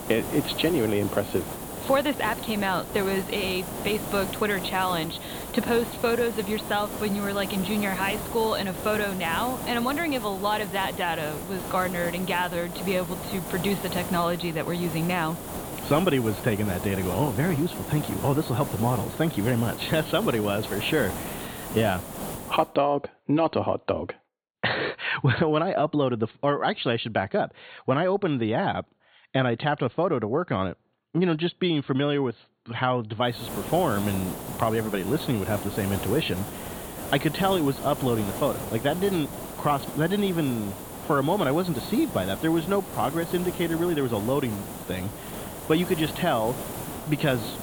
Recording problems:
high frequencies cut off; severe; nothing above 4.5 kHz
hiss; loud; until 23 s and from 33 s on; 8 dB below the speech

